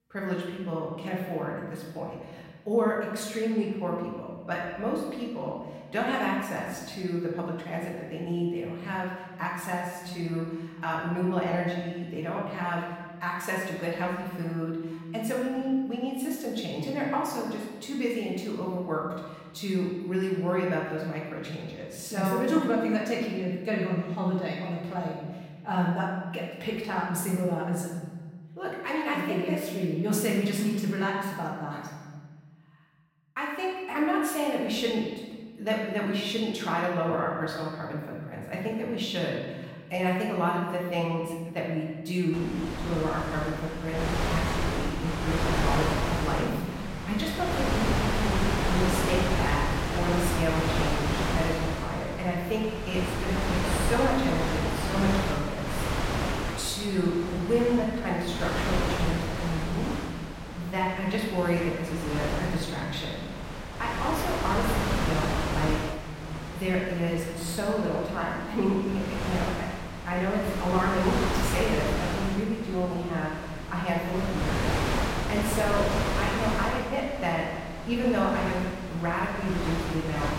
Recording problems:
off-mic speech; far
room echo; noticeable; dies away in 1.4 s
wind noise on the microphone; heavy; from 42 s on; 1 dB below the speech

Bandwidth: 16 kHz